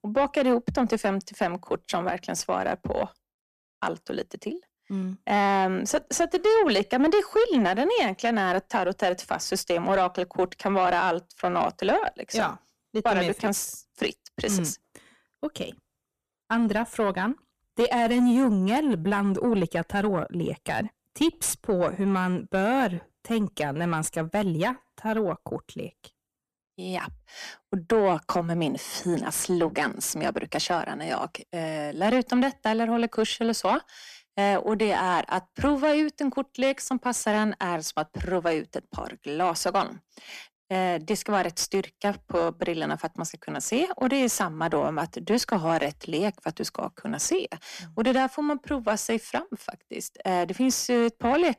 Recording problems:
distortion; slight; 10 dB below the speech

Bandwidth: 14.5 kHz